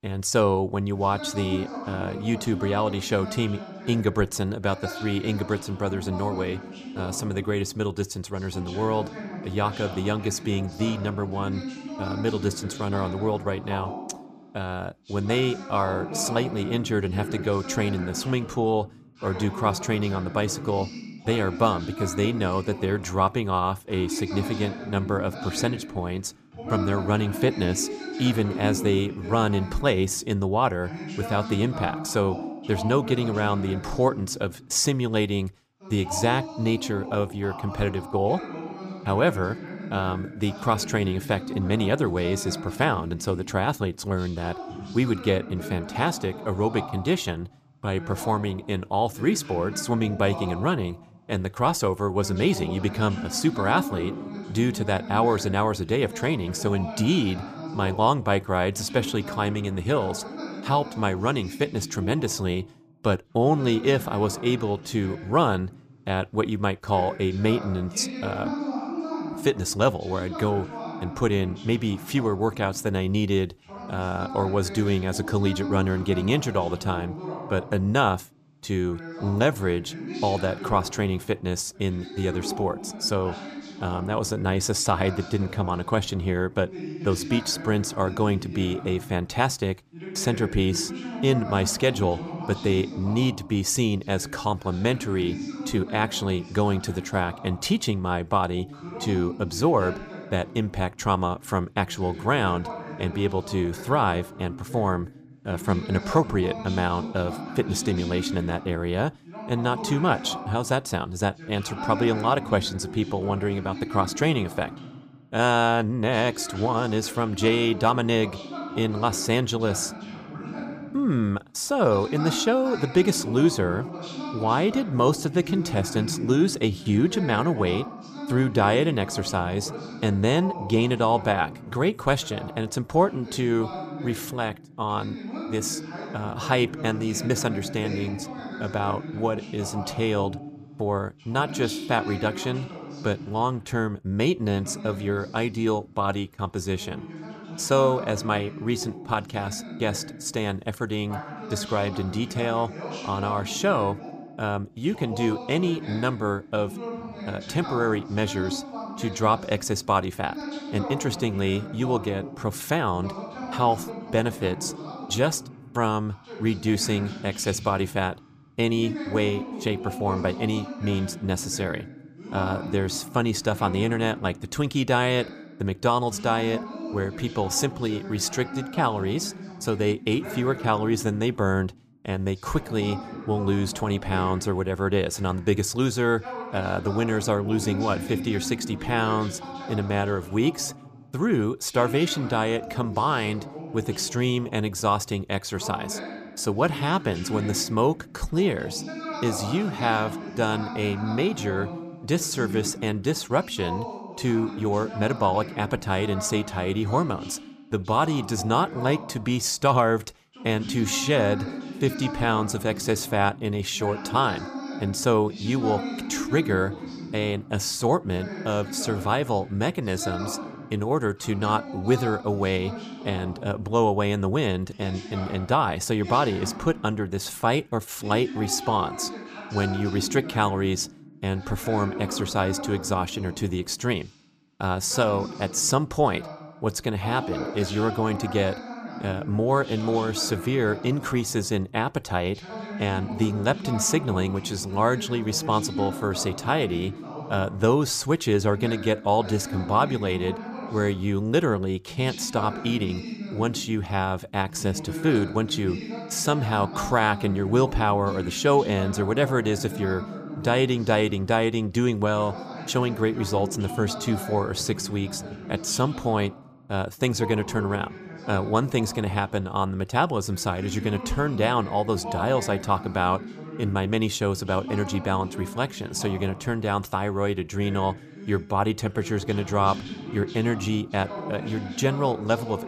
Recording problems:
voice in the background; noticeable; throughout; 10 dB below the speech

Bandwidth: 15 kHz